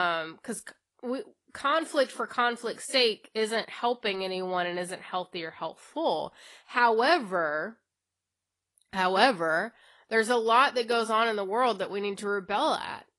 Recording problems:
garbled, watery; slightly; nothing above 11 kHz
abrupt cut into speech; at the start

